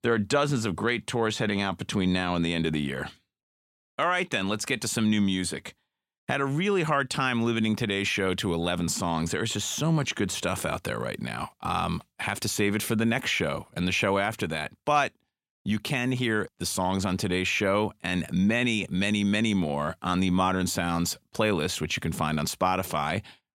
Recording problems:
none

